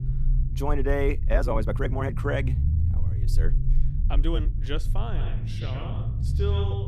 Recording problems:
echo of what is said; strong; from 5 s on; 110 ms later, 10 dB below the speech
low rumble; noticeable; throughout; 10 dB below the speech
uneven, jittery; strongly; from 1 to 6.5 s

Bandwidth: 14.5 kHz